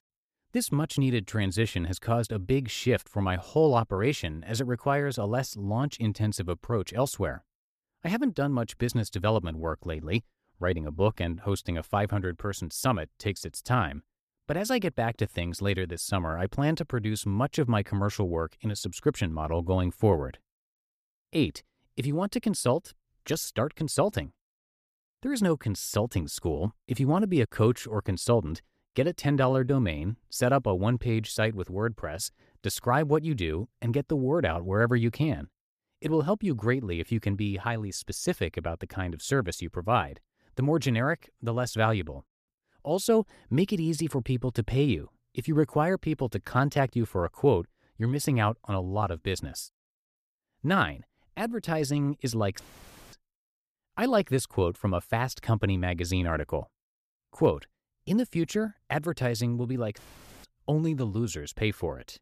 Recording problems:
none

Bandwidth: 14.5 kHz